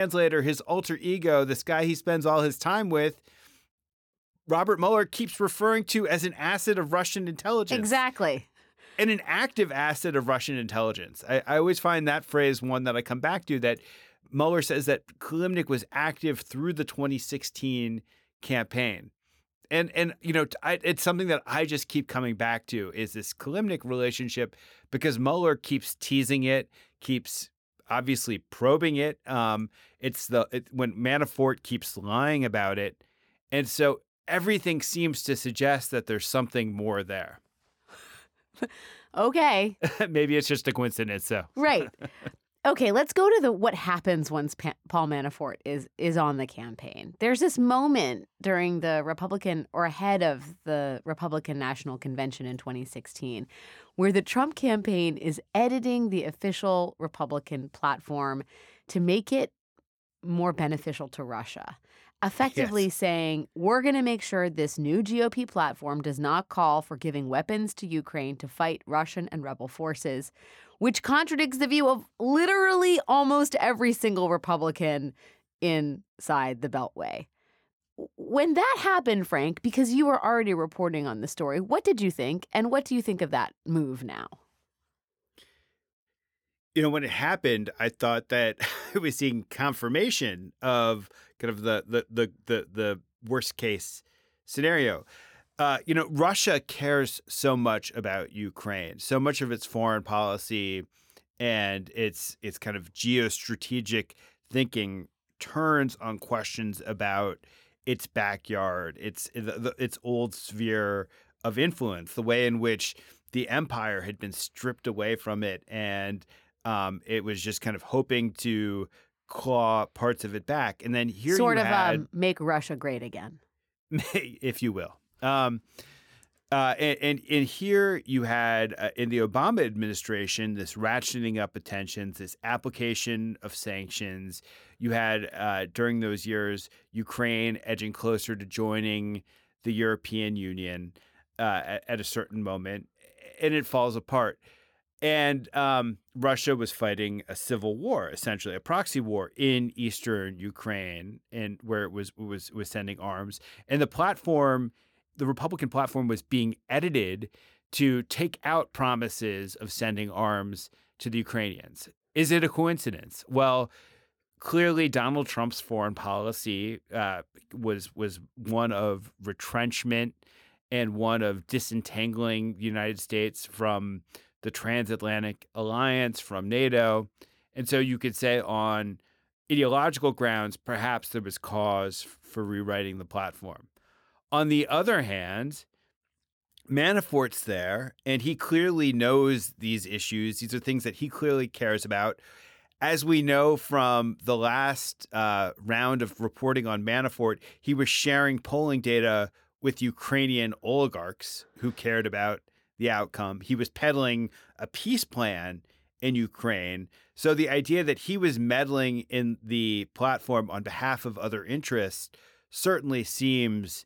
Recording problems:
abrupt cut into speech; at the start

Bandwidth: 18 kHz